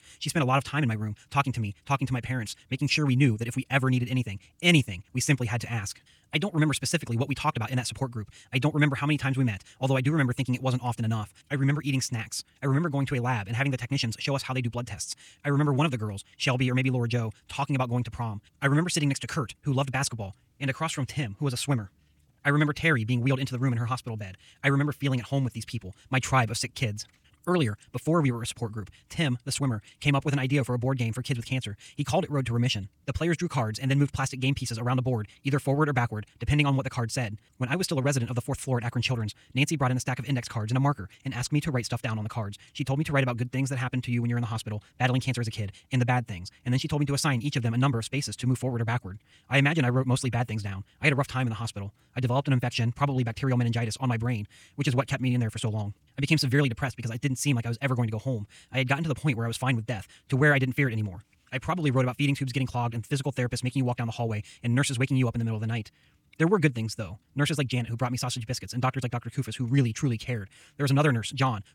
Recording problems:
wrong speed, natural pitch; too fast; 1.7 times normal speed

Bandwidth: 18 kHz